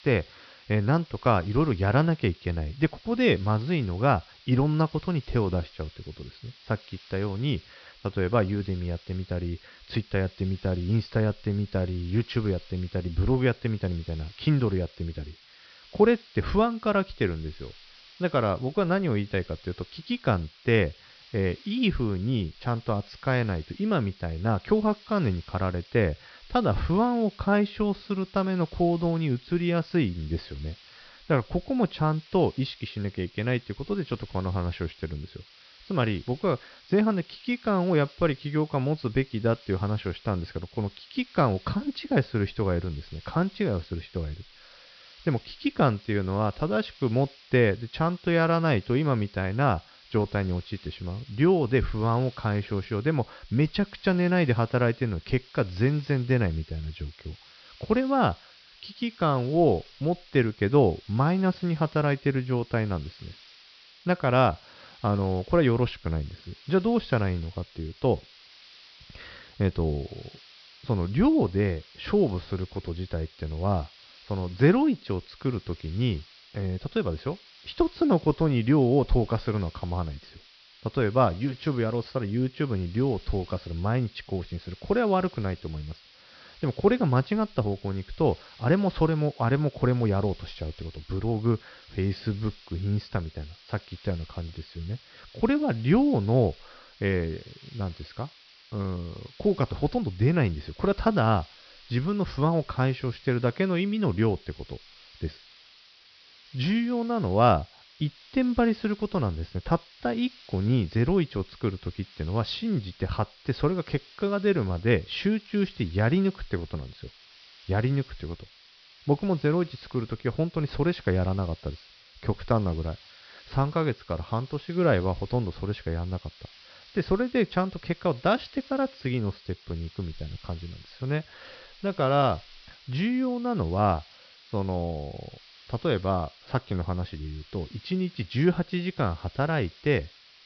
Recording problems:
high frequencies cut off; noticeable; nothing above 5.5 kHz
hiss; faint; throughout; 25 dB below the speech

